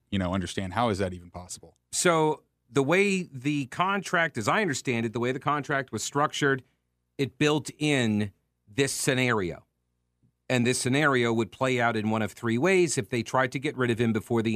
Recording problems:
abrupt cut into speech; at the end

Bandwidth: 14.5 kHz